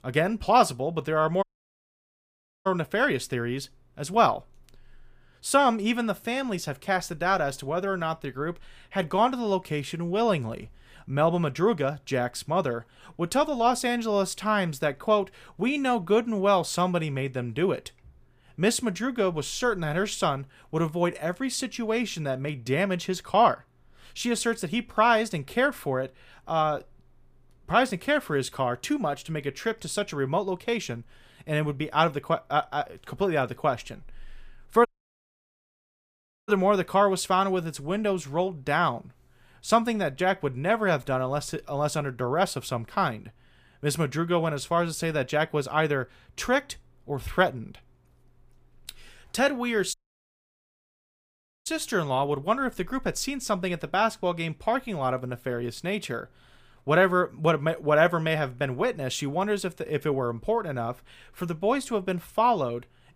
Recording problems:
audio cutting out; at 1.5 s for 1 s, at 35 s for 1.5 s and at 50 s for 1.5 s

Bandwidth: 15 kHz